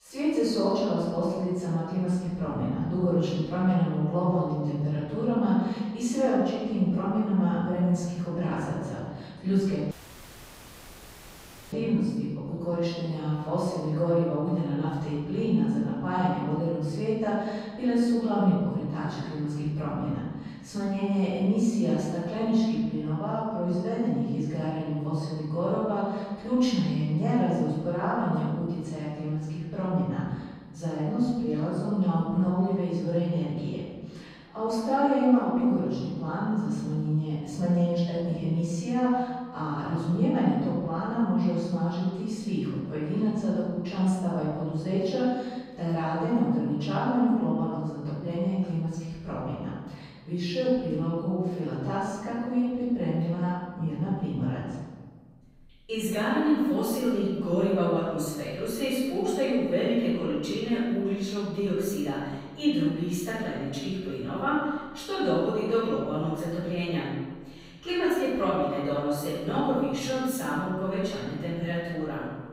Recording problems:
room echo; strong; dies away in 1.3 s
off-mic speech; far
audio cutting out; at 10 s for 2 s

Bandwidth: 15.5 kHz